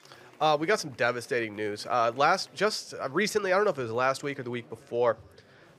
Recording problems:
murmuring crowd; faint; throughout; 30 dB below the speech

